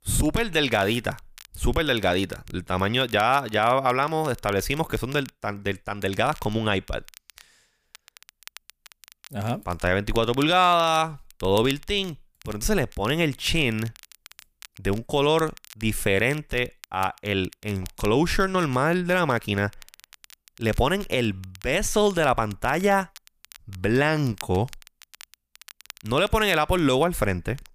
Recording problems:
crackle, like an old record; faint; 25 dB below the speech

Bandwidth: 15 kHz